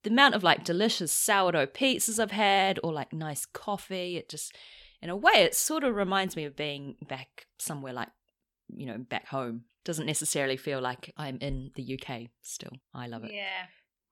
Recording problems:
none

